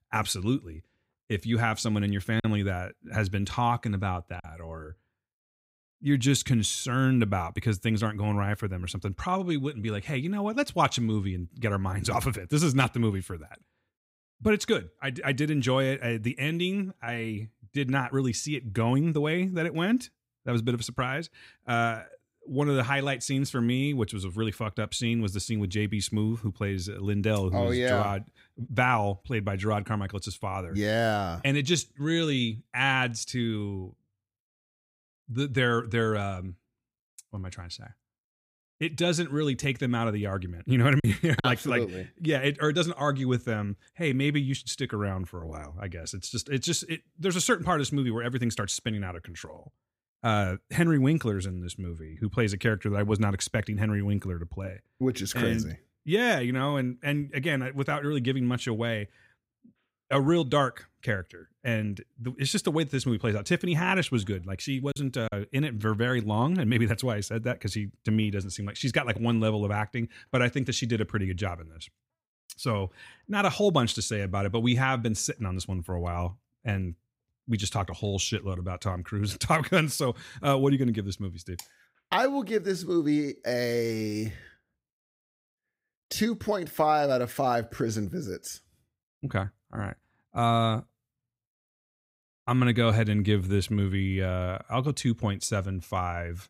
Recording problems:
choppy; occasionally; from 2.5 to 4.5 s, at 41 s and at 1:05; 3% of the speech affected

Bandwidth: 15.5 kHz